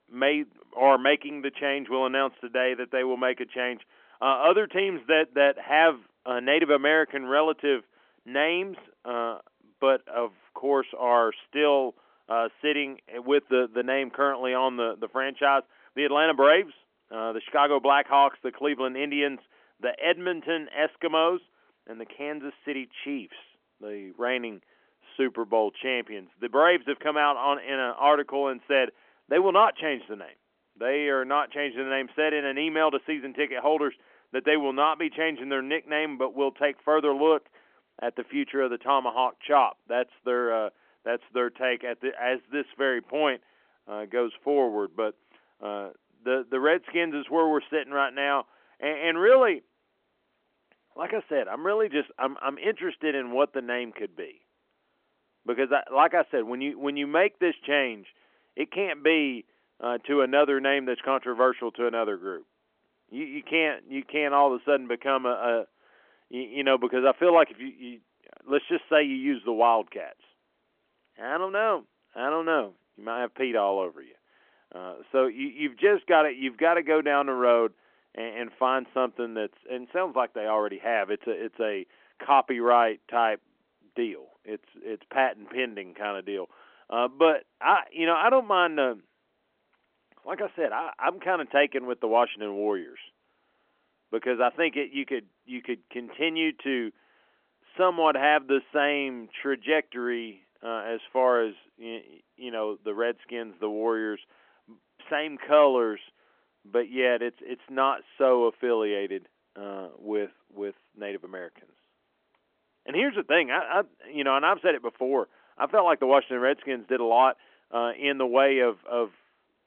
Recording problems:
phone-call audio; nothing above 3.5 kHz

